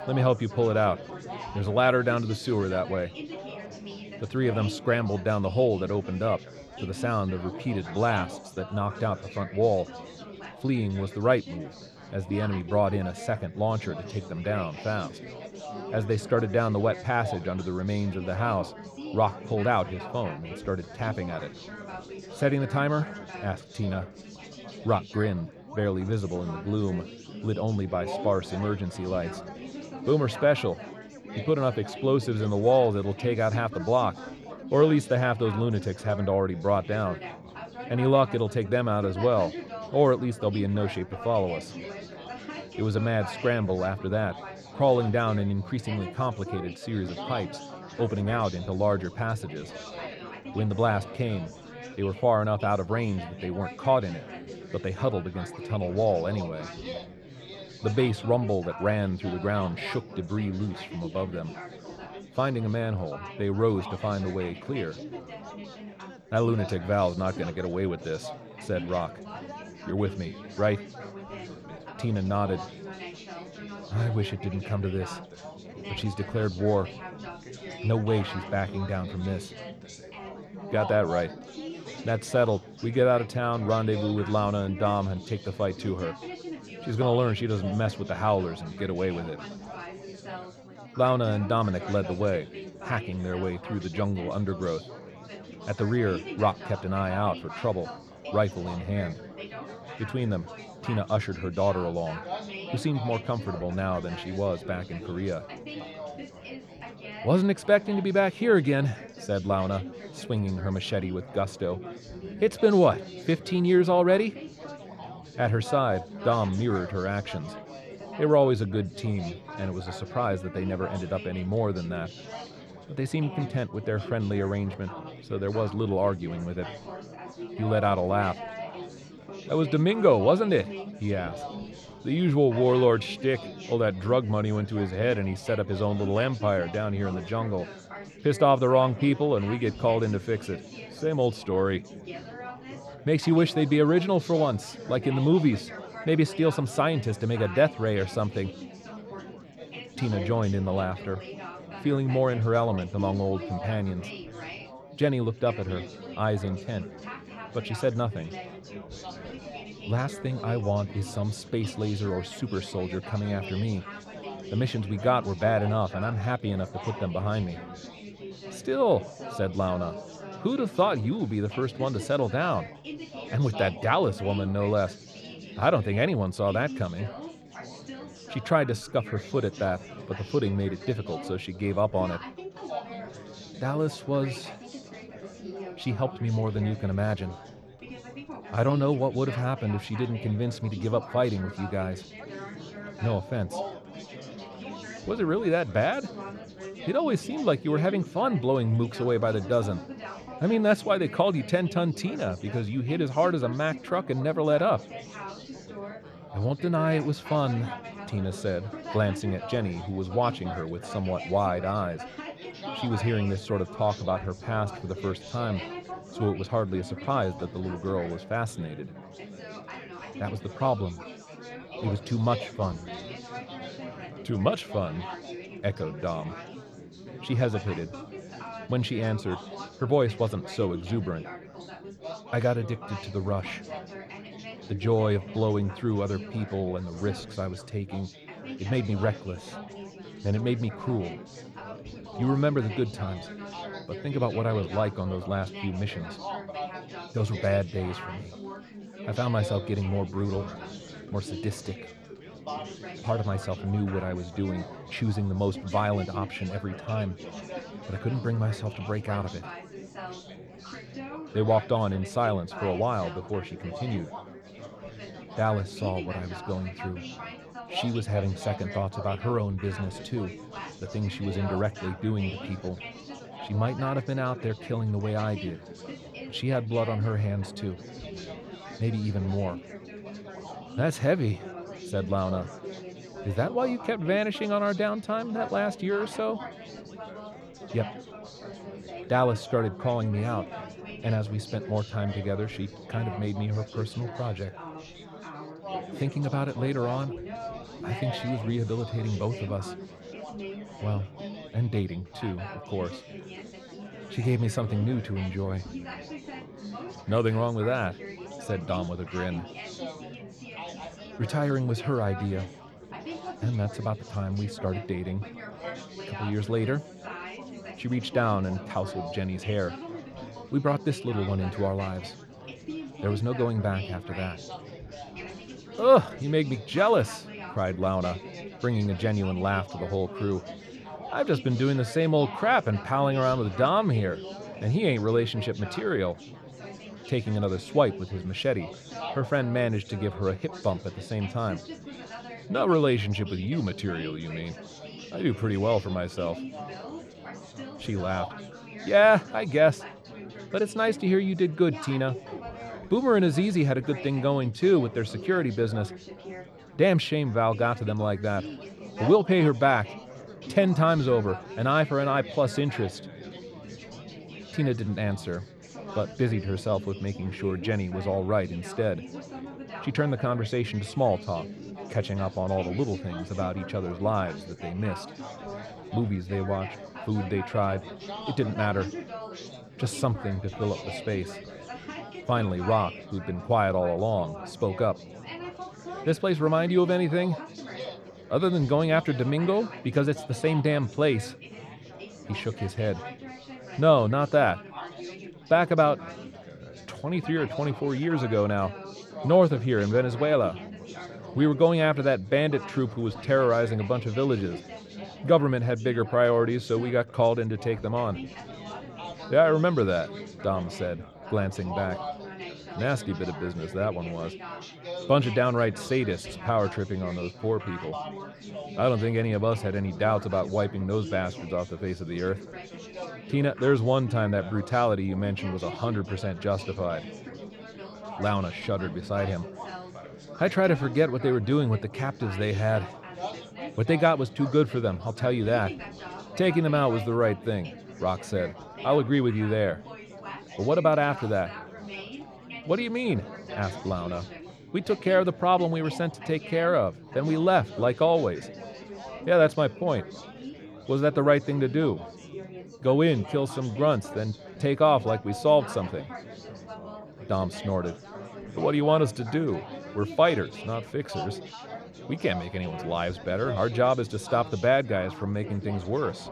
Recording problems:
chatter from many people; noticeable; throughout; 15 dB below the speech

